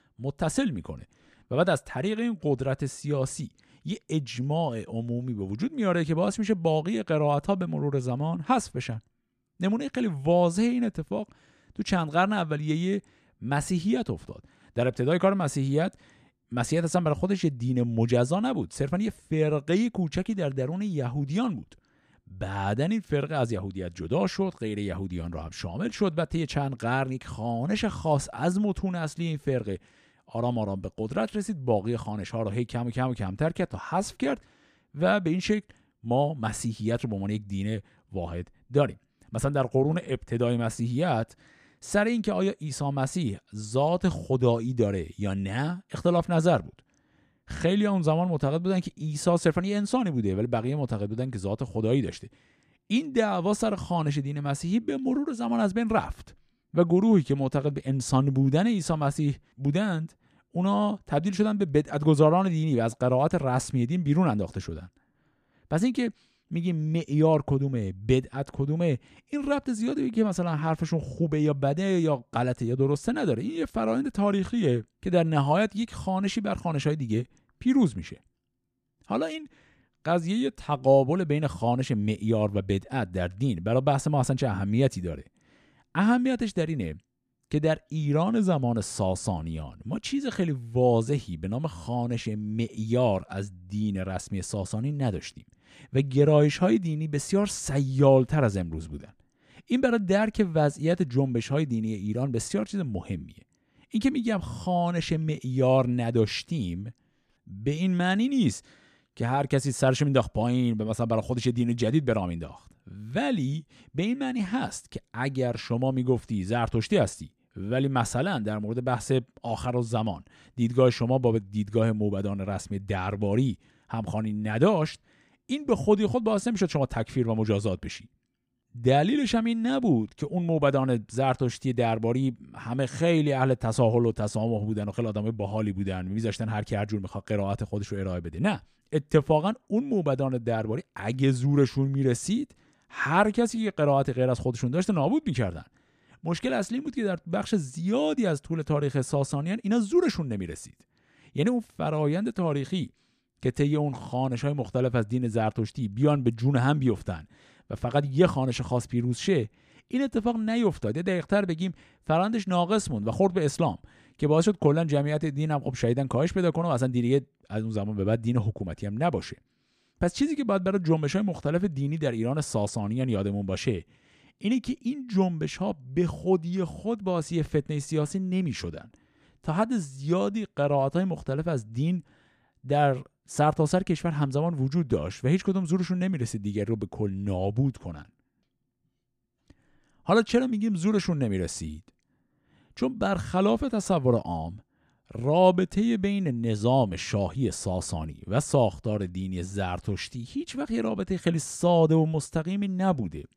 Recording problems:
none

